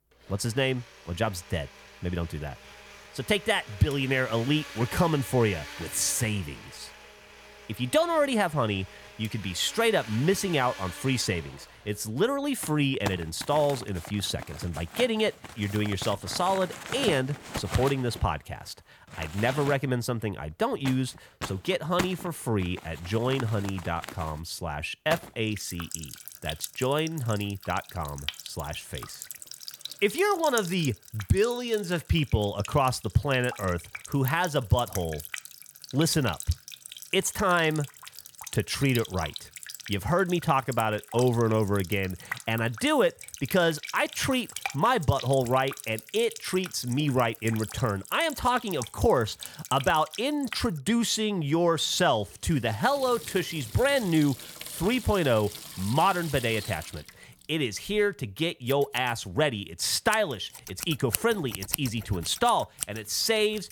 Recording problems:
household noises; noticeable; throughout; 10 dB below the speech

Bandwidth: 18 kHz